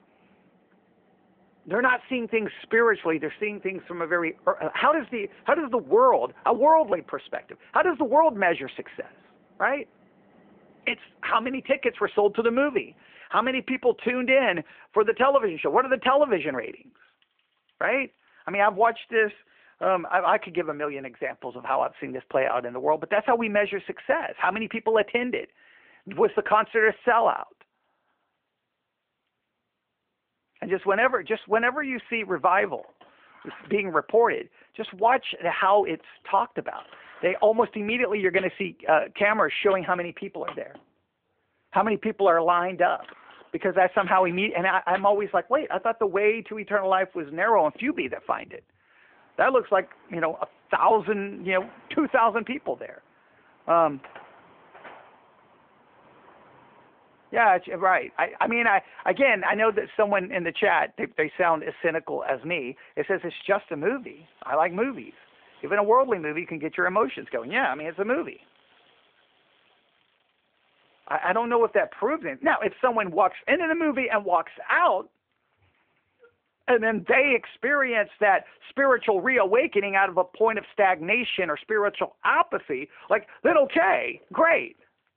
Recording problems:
phone-call audio
traffic noise; faint; throughout; 25 dB below the speech

